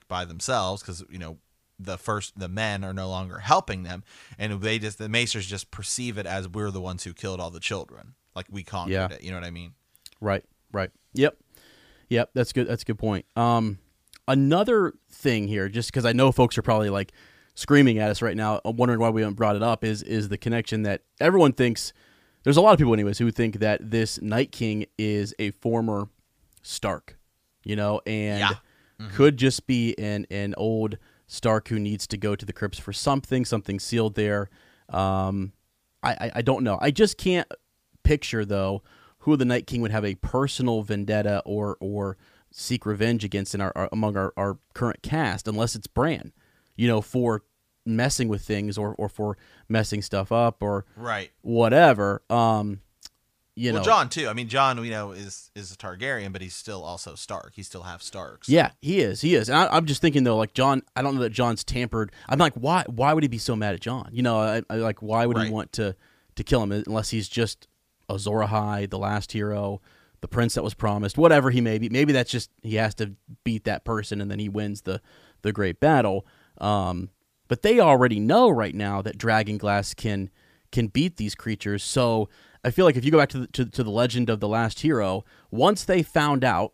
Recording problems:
none

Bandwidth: 15 kHz